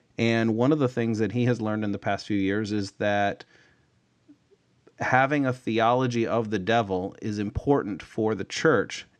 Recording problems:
none

